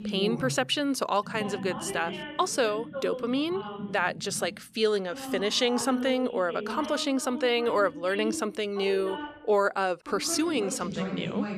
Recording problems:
voice in the background; loud; throughout; 9 dB below the speech

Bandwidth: 14.5 kHz